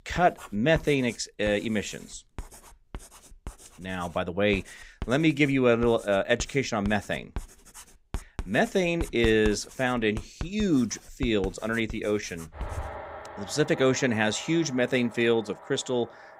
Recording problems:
household noises; noticeable; throughout; 15 dB below the speech

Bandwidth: 15.5 kHz